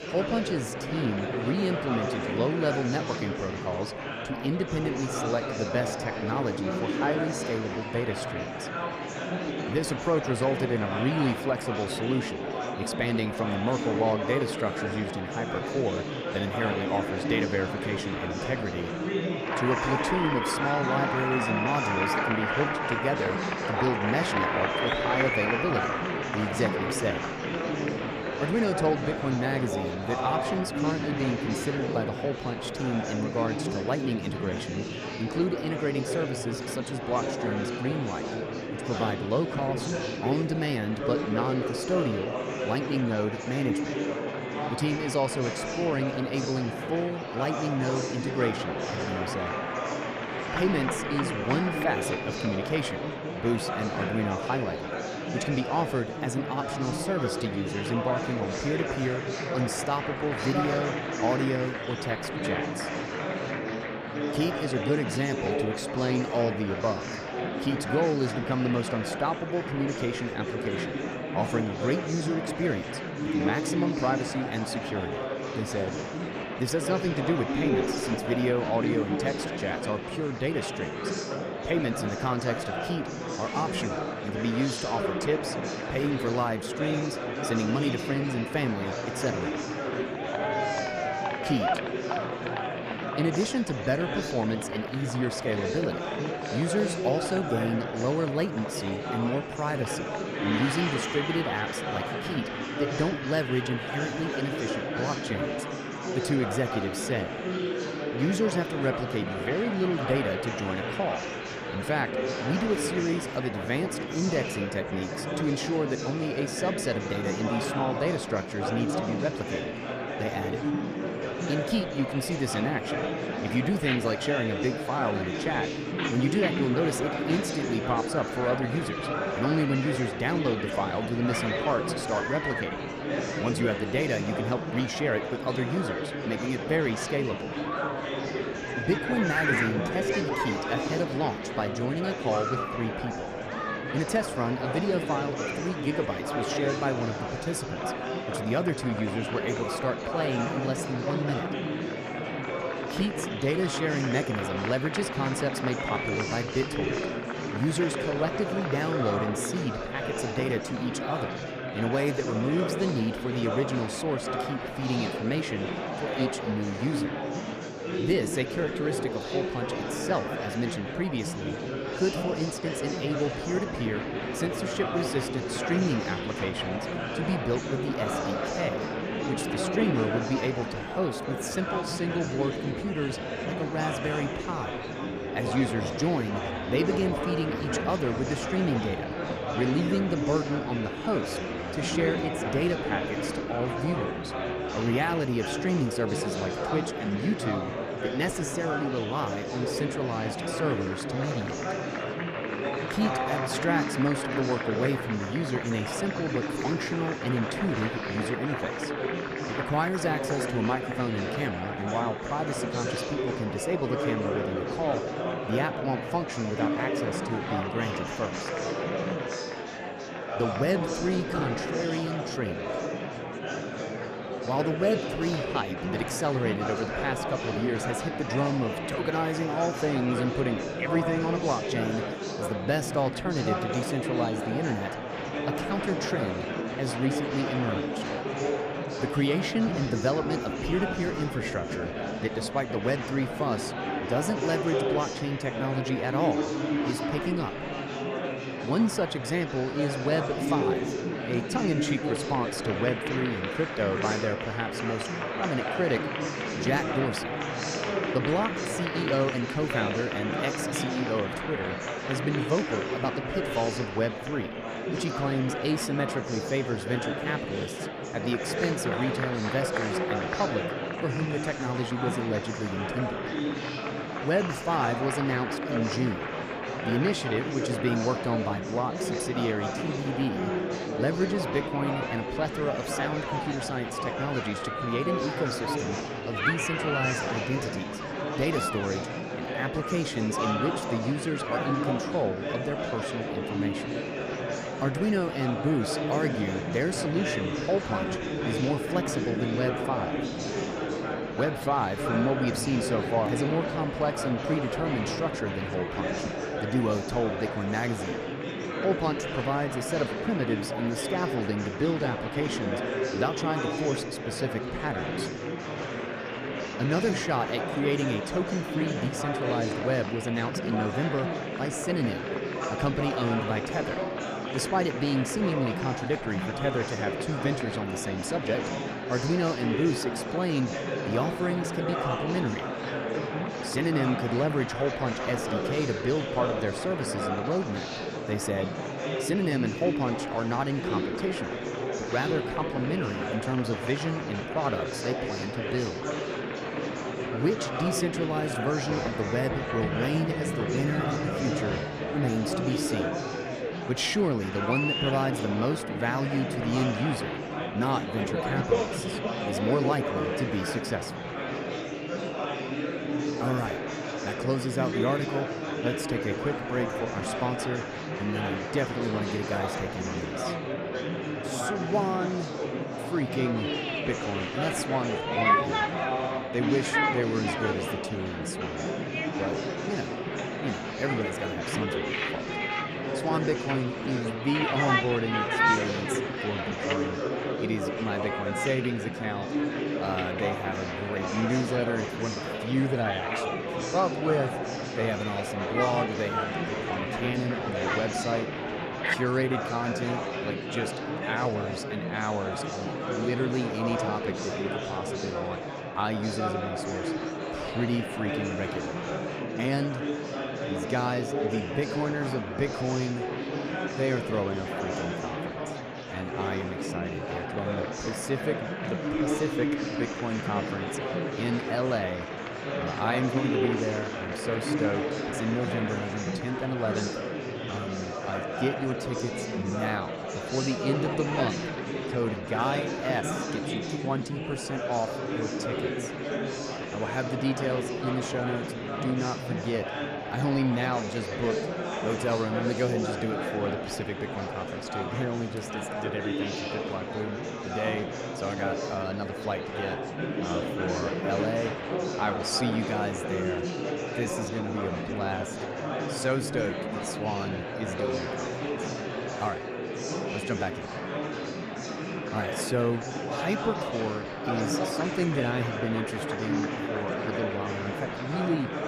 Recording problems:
murmuring crowd; loud; throughout; 1 dB below the speech

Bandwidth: 14.5 kHz